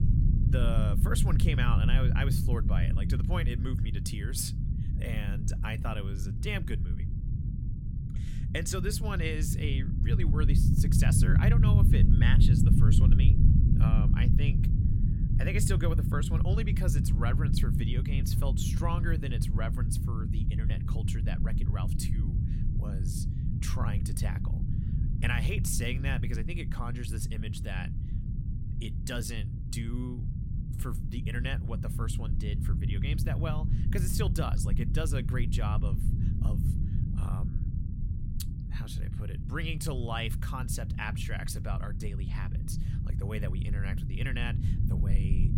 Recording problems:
low rumble; loud; throughout; 4 dB below the speech

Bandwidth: 16.5 kHz